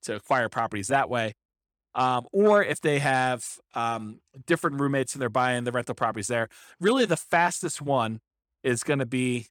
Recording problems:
none

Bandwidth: 18.5 kHz